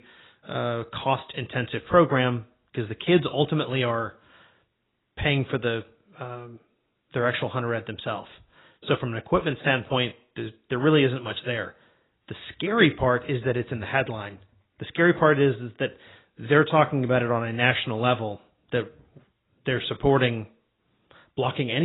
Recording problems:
garbled, watery; badly; nothing above 4 kHz
abrupt cut into speech; at the end

